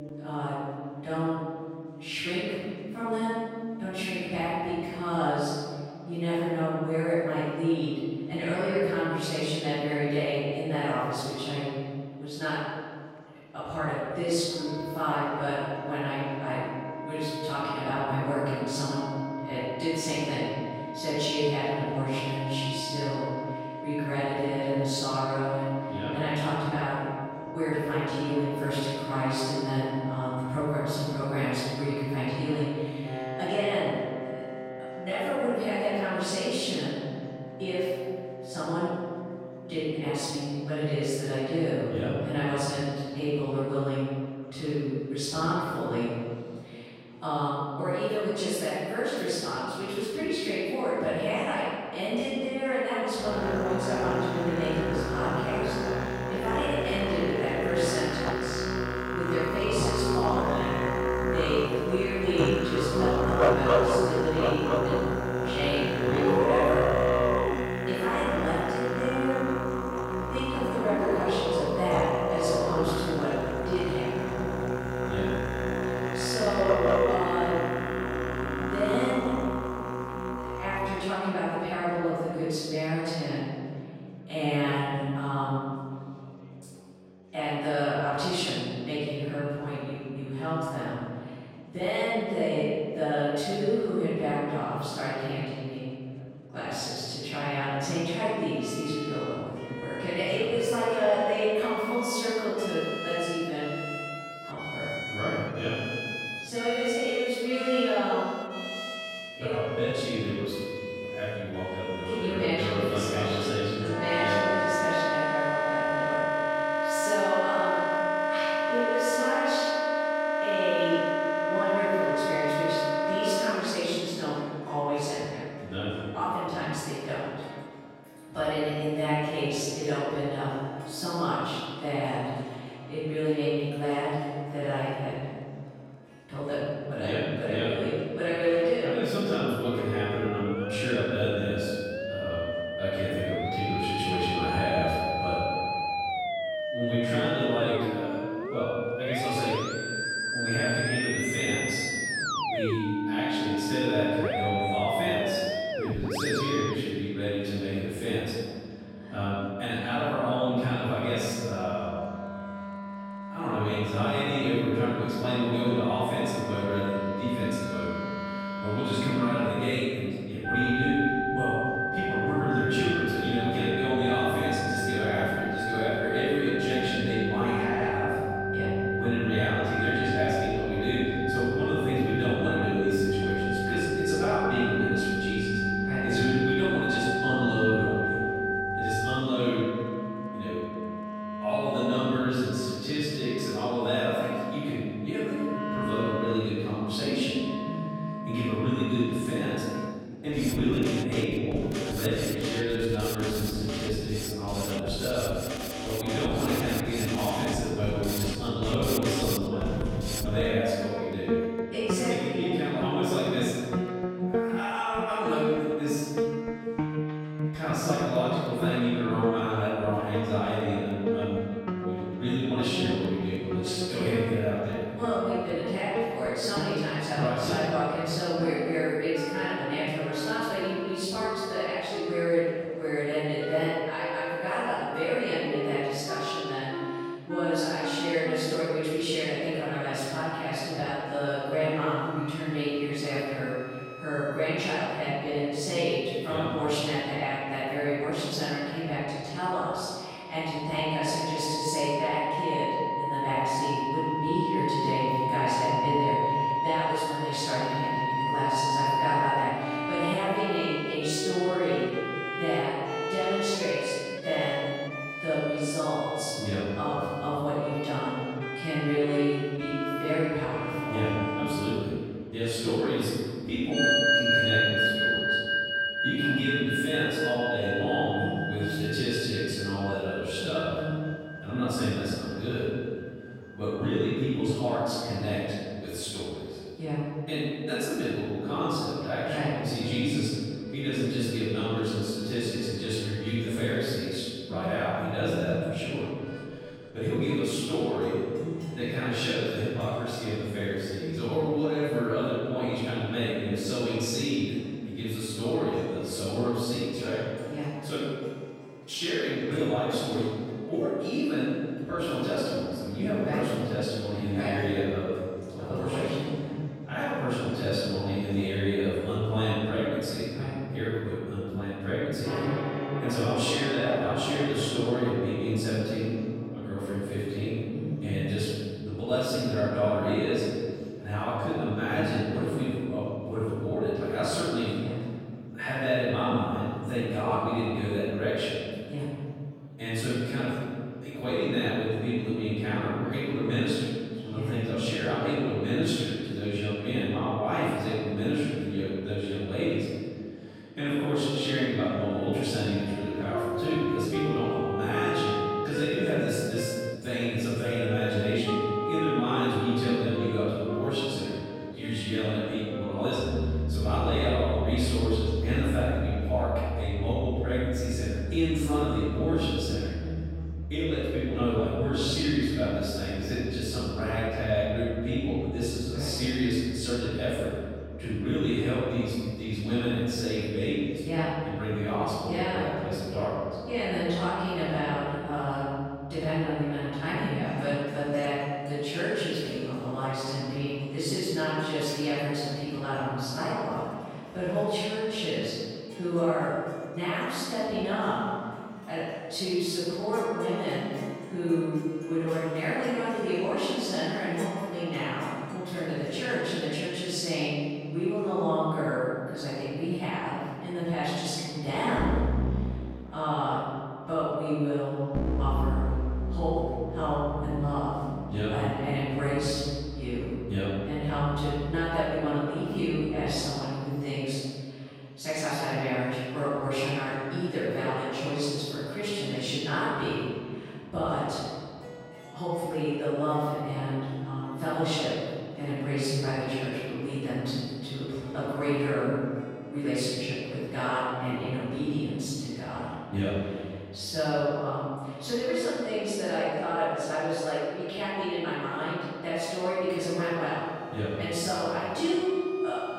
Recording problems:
room echo; strong; dies away in 2.1 s
off-mic speech; far
background music; loud; throughout; 2 dB below the speech
murmuring crowd; faint; throughout; 30 dB below the speech

